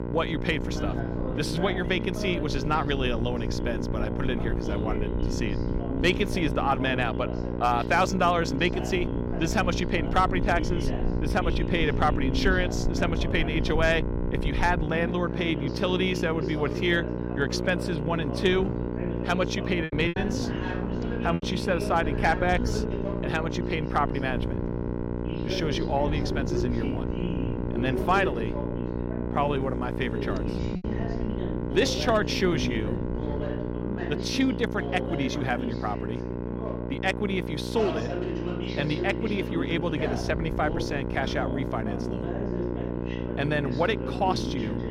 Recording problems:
electrical hum; loud; throughout; 60 Hz, 8 dB below the speech
voice in the background; loud; throughout; 8 dB below the speech
wind noise on the microphone; occasional gusts; 25 dB below the speech
low rumble; faint; until 15 s and from 22 to 33 s; 25 dB below the speech
choppy; very; from 20 to 21 s; 8% of the speech affected

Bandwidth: 16 kHz